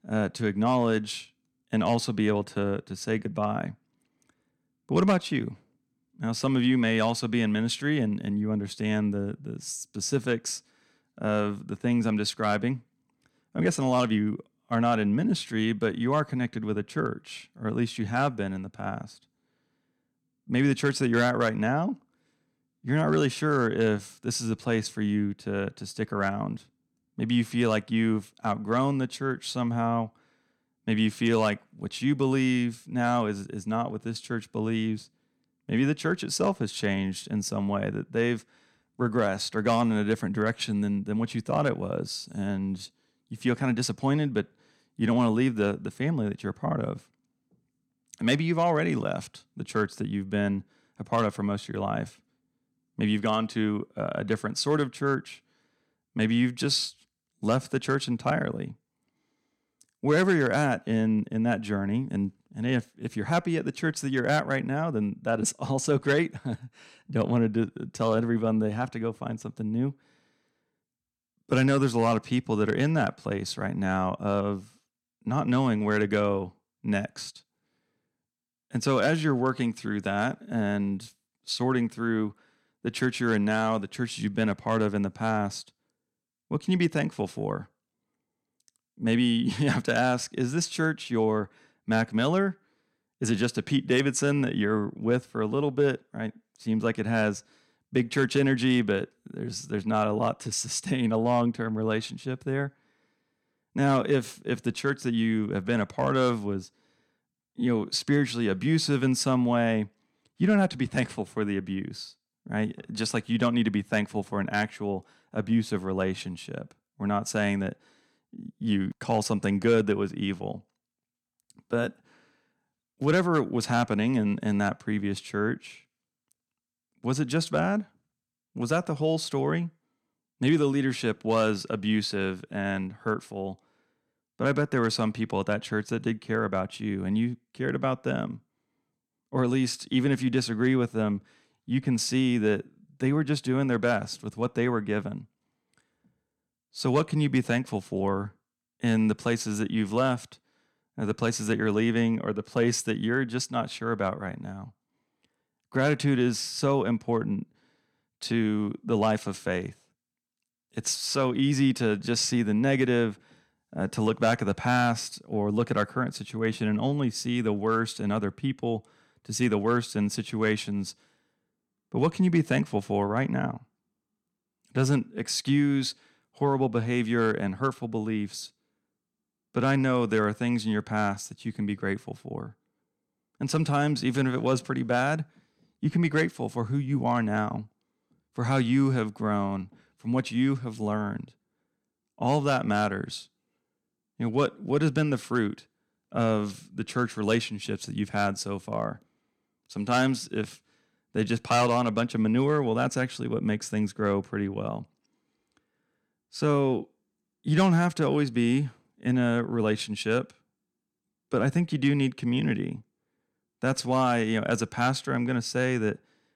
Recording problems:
none

